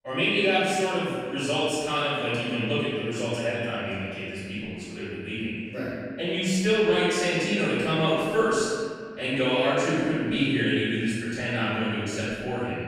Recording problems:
room echo; strong; dies away in 1.9 s
off-mic speech; far

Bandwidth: 14.5 kHz